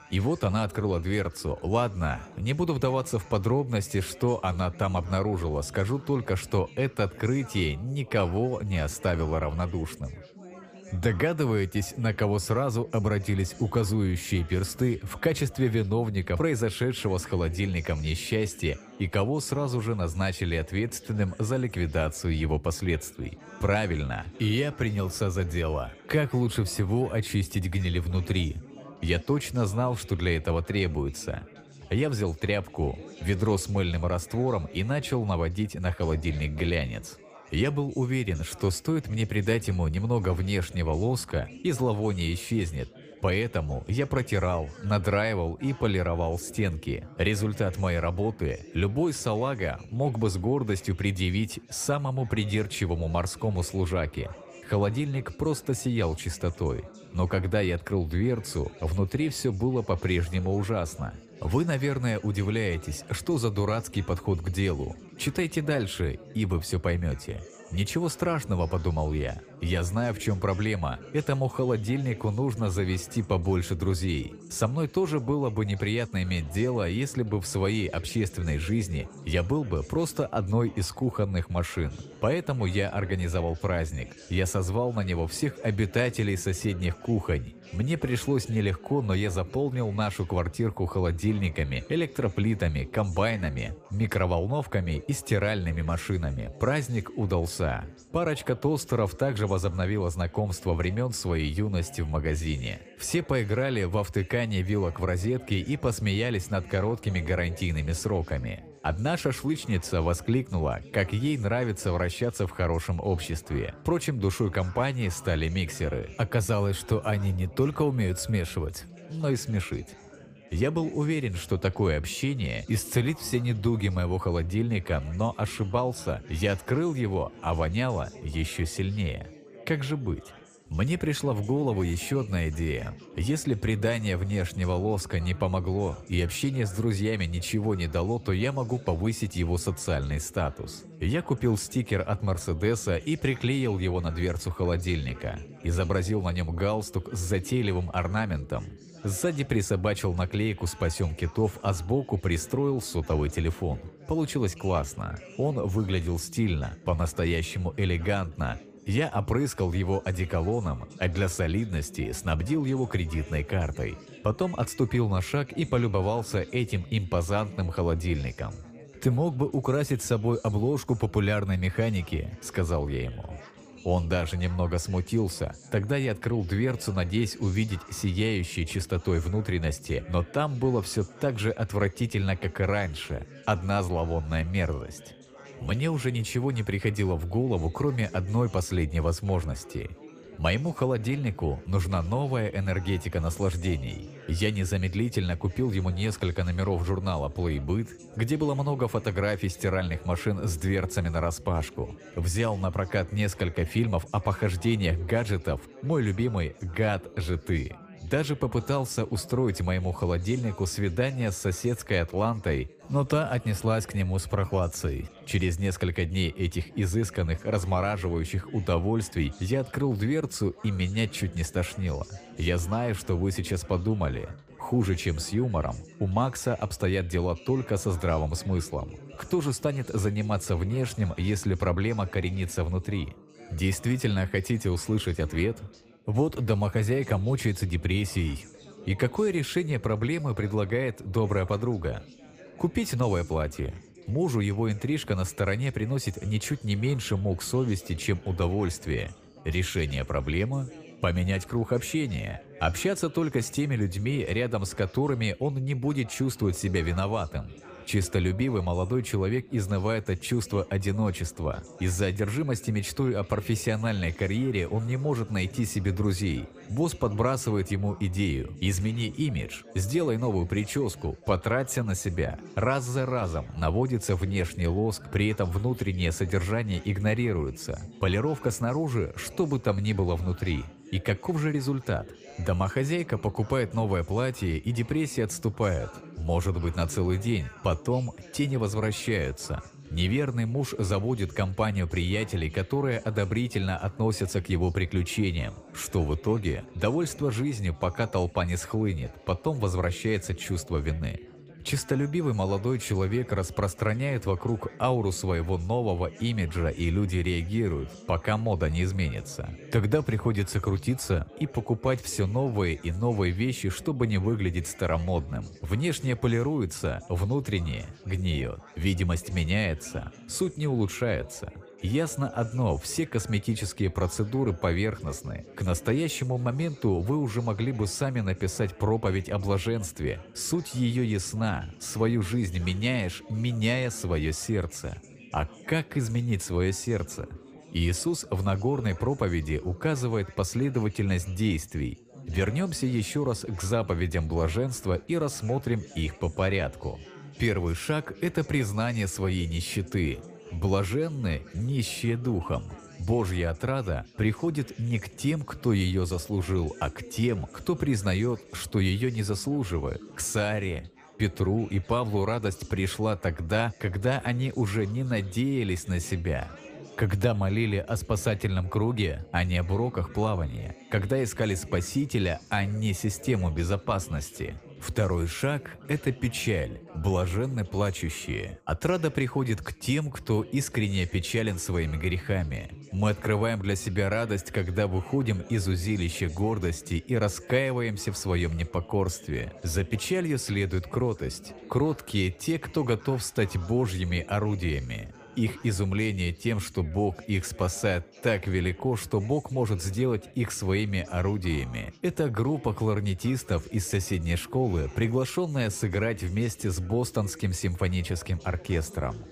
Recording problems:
chatter from many people; noticeable; throughout; 20 dB below the speech

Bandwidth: 15 kHz